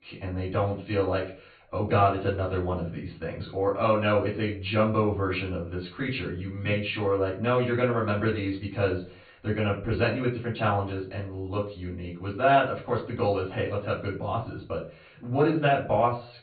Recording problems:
off-mic speech; far
high frequencies cut off; severe; nothing above 4.5 kHz
room echo; slight; dies away in 0.3 s

